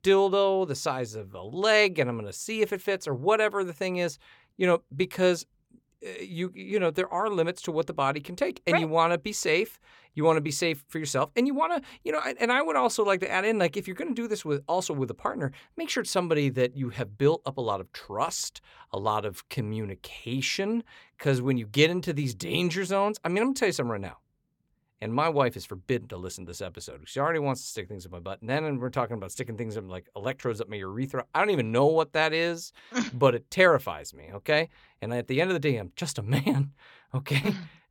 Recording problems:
none

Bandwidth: 17 kHz